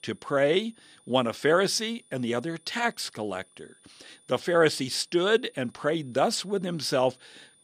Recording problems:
high-pitched whine; faint; throughout; 9.5 kHz, 30 dB below the speech

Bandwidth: 14.5 kHz